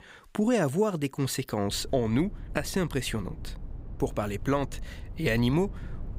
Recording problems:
low rumble; faint; from 1.5 s on; 25 dB below the speech

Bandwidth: 15.5 kHz